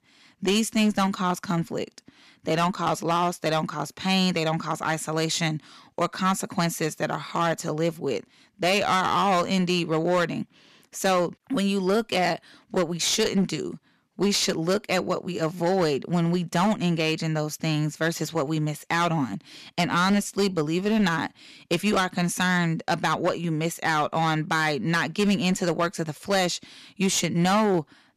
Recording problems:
distortion; slight; 9% of the sound clipped

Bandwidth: 14.5 kHz